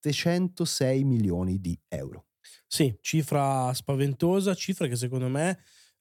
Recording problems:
none

